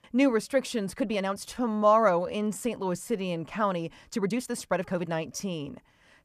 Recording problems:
uneven, jittery; strongly; from 1 to 5 s

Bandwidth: 14.5 kHz